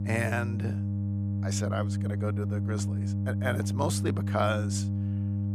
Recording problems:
electrical hum; loud; throughout; 50 Hz, 8 dB below the speech

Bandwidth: 15 kHz